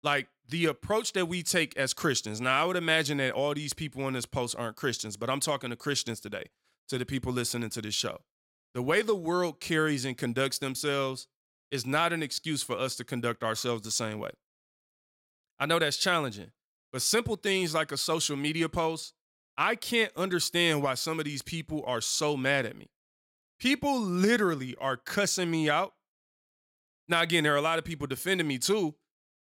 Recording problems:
none

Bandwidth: 16 kHz